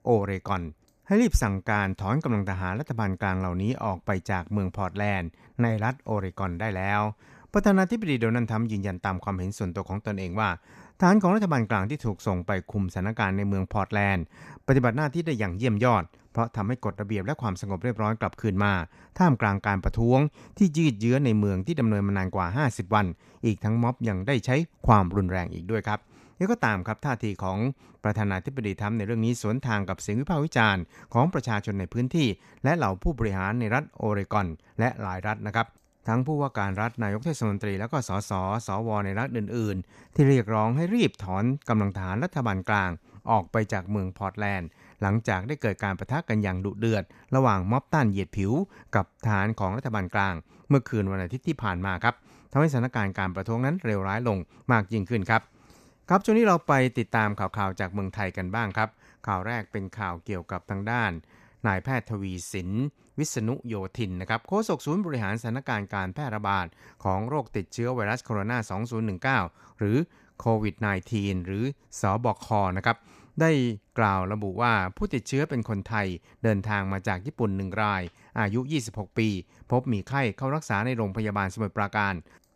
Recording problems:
none

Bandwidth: 14.5 kHz